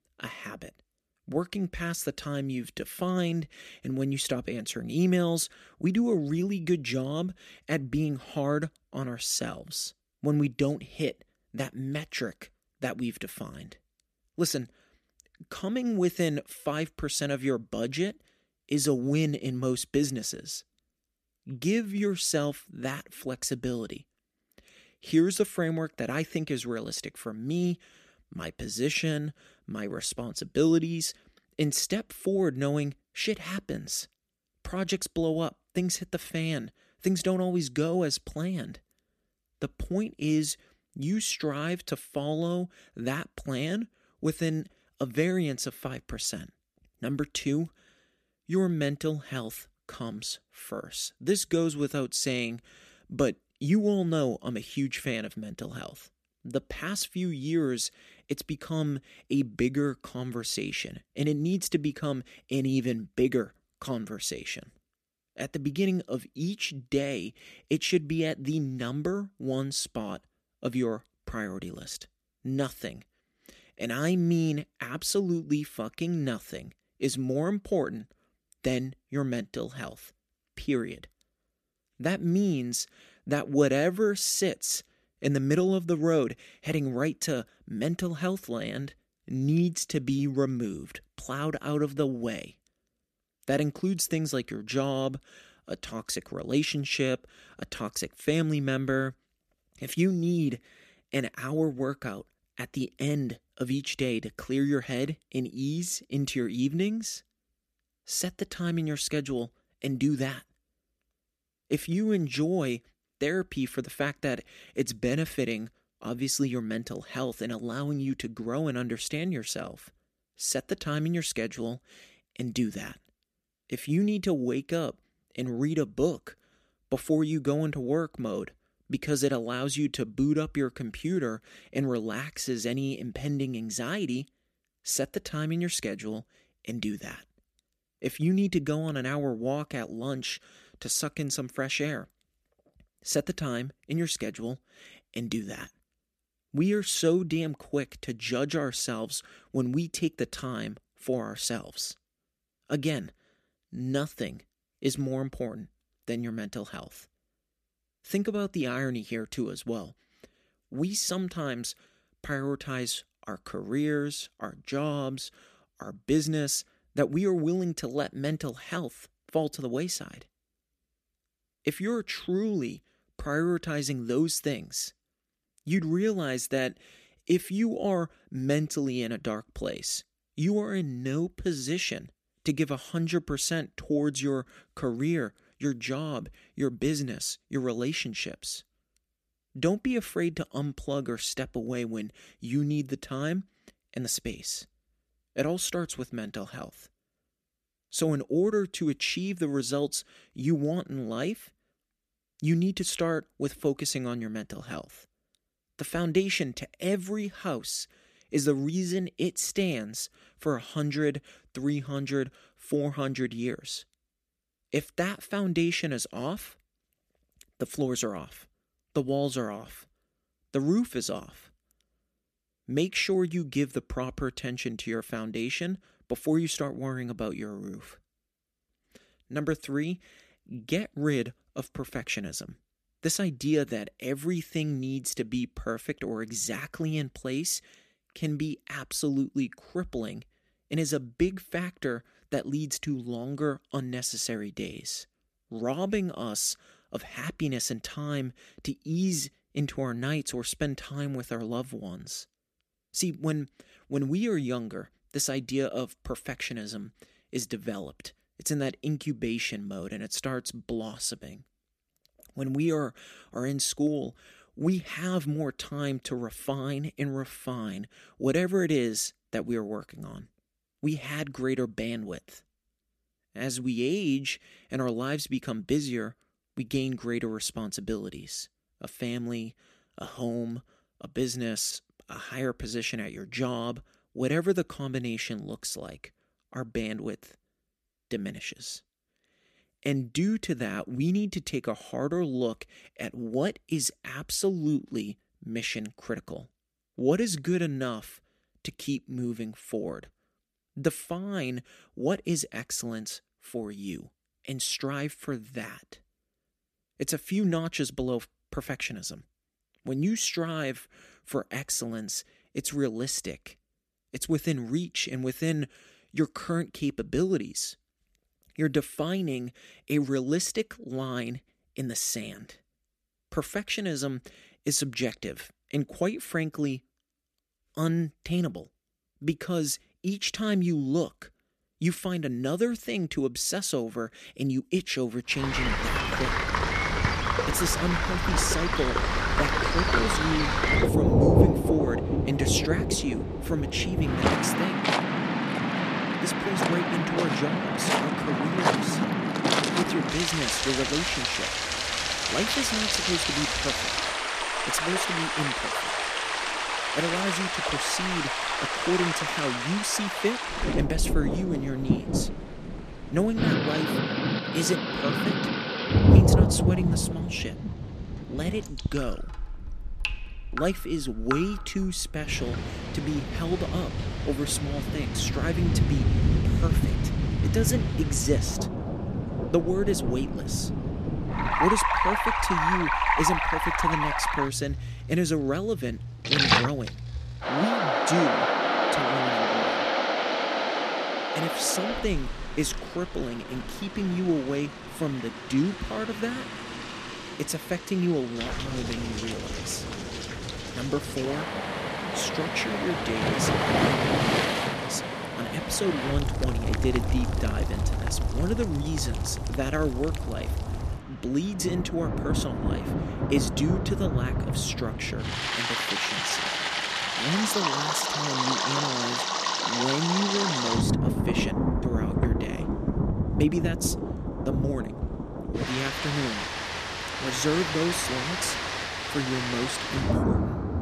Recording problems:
rain or running water; very loud; from 5:35 on; 3 dB above the speech

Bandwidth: 14.5 kHz